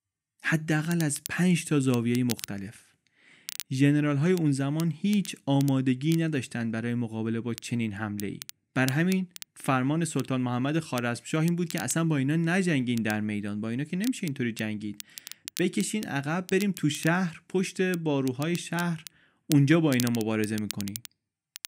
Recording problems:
crackle, like an old record; noticeable; 15 dB below the speech

